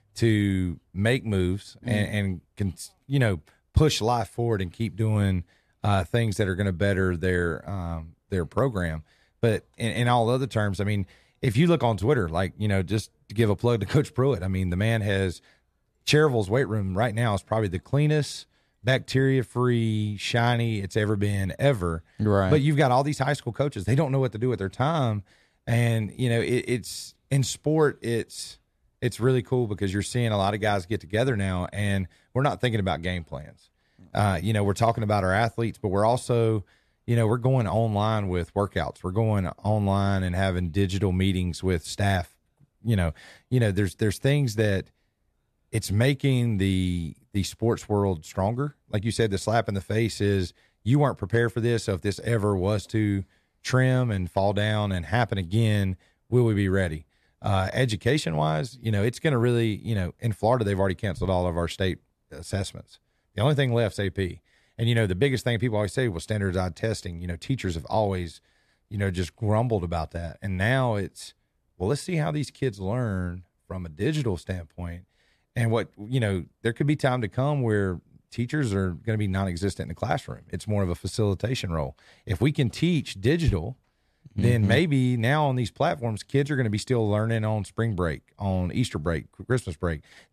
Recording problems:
none

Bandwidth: 13.5 kHz